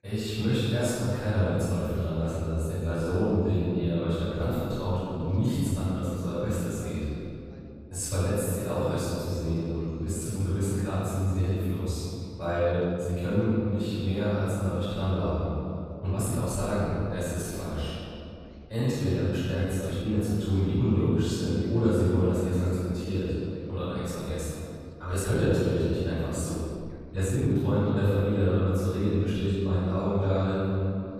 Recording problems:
room echo; strong; dies away in 2.8 s
off-mic speech; far
voice in the background; faint; throughout; 30 dB below the speech
uneven, jittery; strongly; from 3 to 28 s

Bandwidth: 14.5 kHz